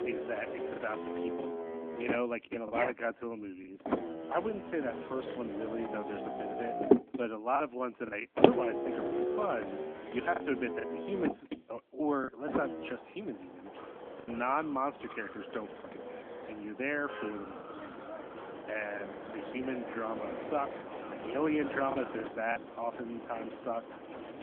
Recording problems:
phone-call audio
traffic noise; loud; throughout; 1 dB below the speech
choppy; occasionally; 4% of the speech affected

